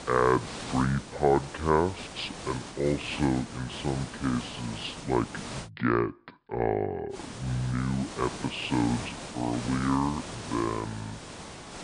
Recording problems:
wrong speed and pitch; too slow and too low; 0.6 times normal speed
high frequencies cut off; noticeable; nothing above 5.5 kHz
hiss; noticeable; until 5.5 s and from 7 s on; 10 dB below the speech

